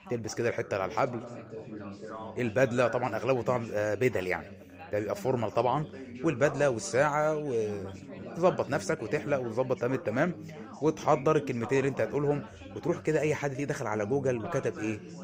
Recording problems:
background chatter; noticeable; throughout; 3 voices, 15 dB below the speech

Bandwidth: 15.5 kHz